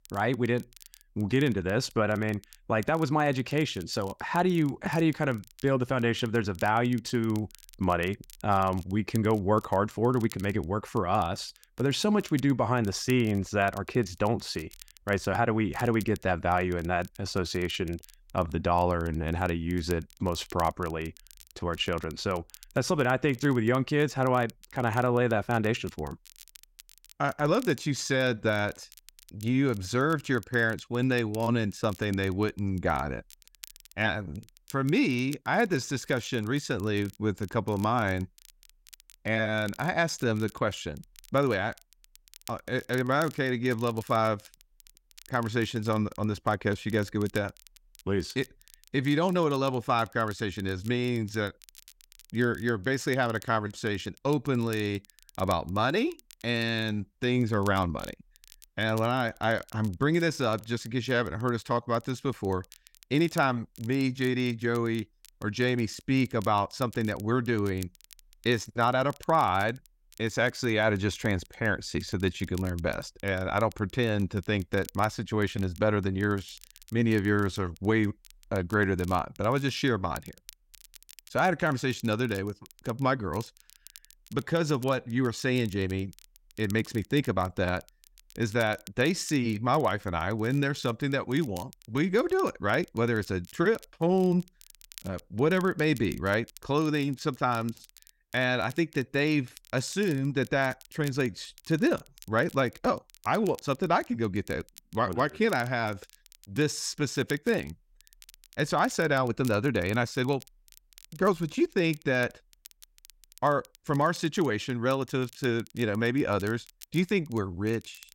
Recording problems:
crackle, like an old record; faint; 25 dB below the speech

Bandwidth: 16 kHz